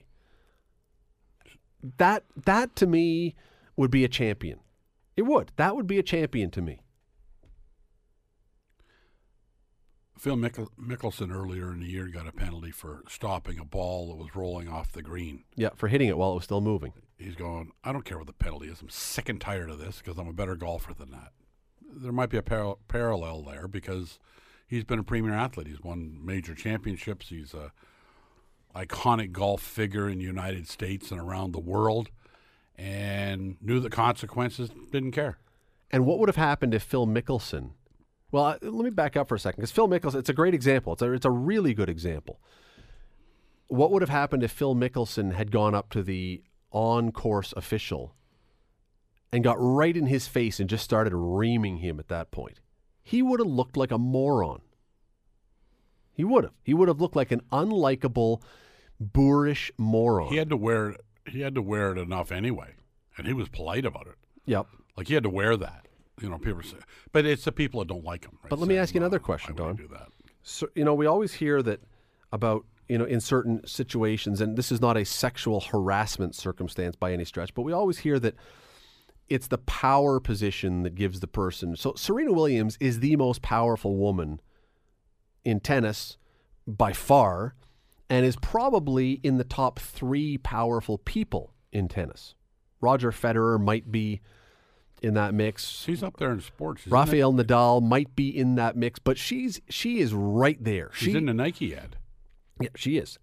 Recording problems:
none

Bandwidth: 14.5 kHz